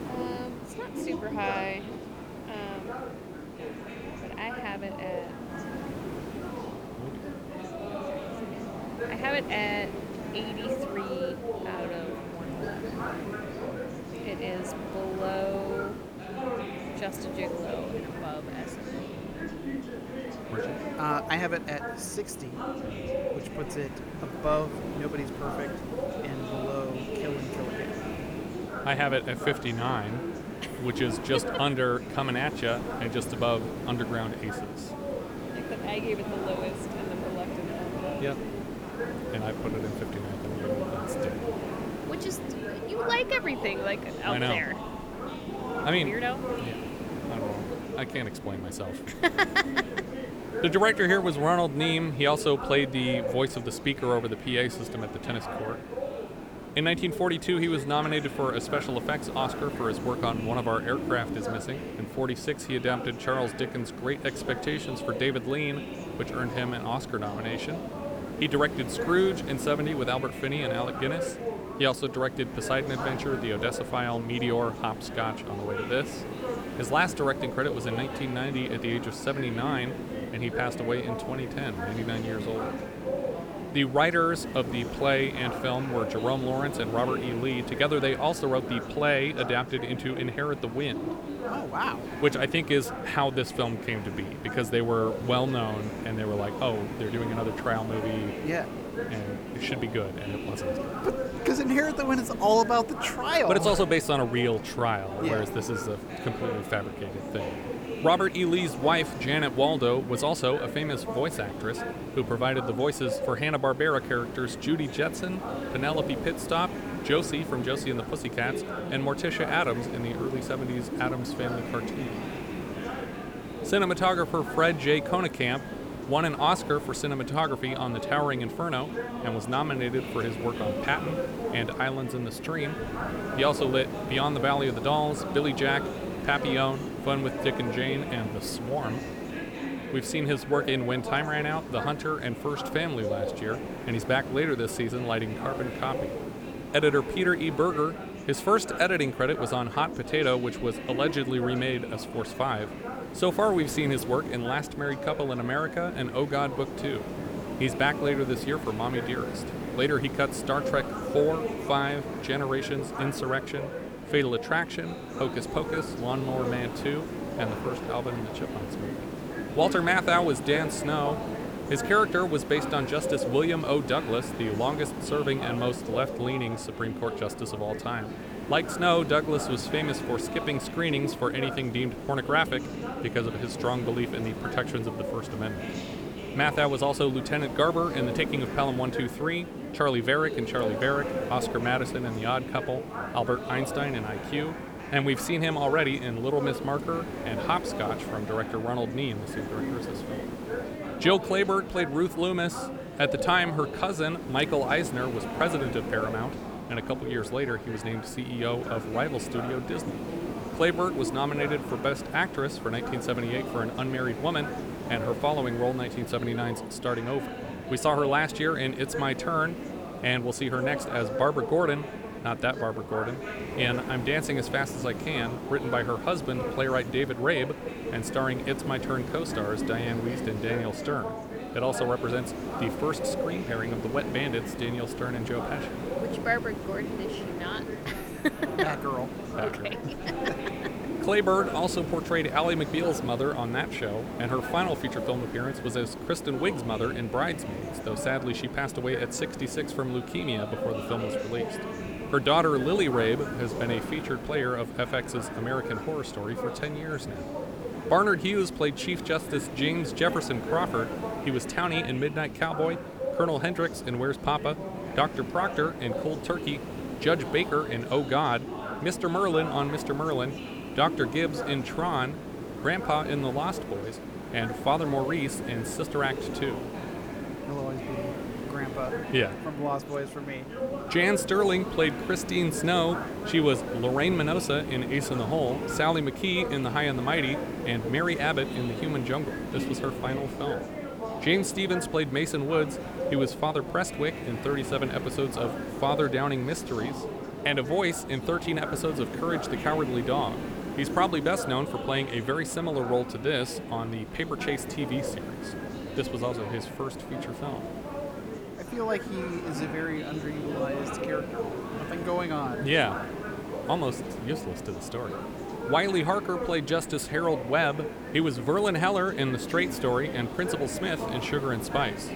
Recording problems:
background chatter; loud; throughout; 4 voices, 9 dB below the speech
hiss; loud; throughout; 10 dB below the speech

